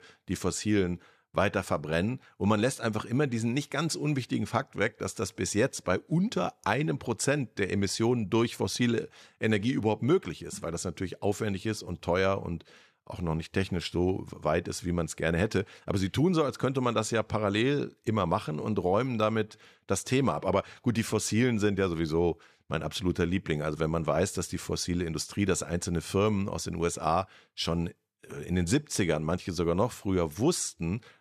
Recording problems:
none

